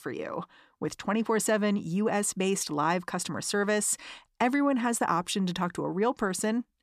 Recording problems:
none

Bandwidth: 14.5 kHz